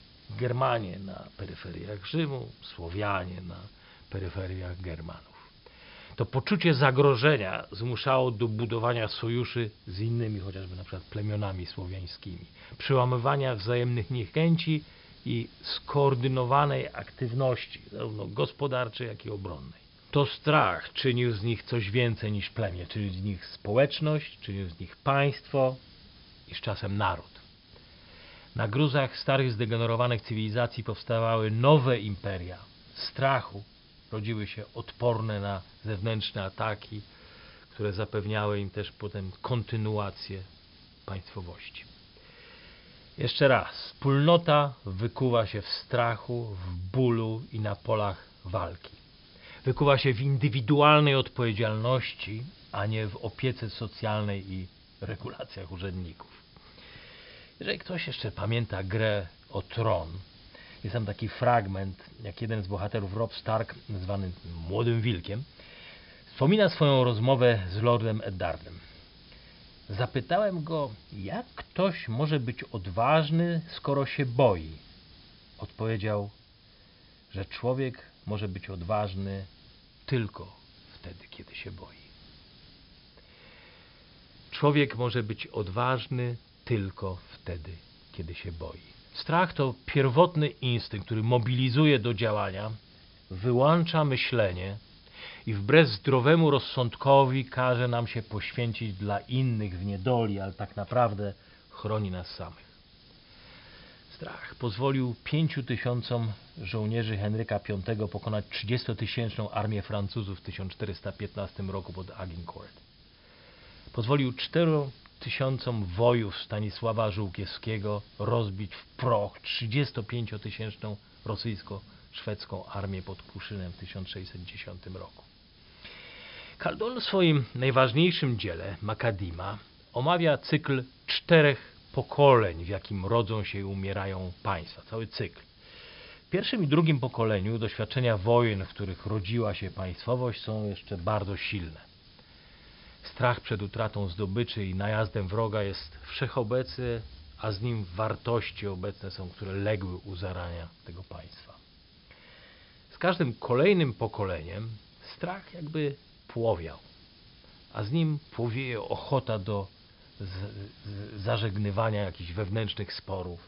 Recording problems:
high frequencies cut off; noticeable; nothing above 5.5 kHz
hiss; faint; throughout; 25 dB below the speech

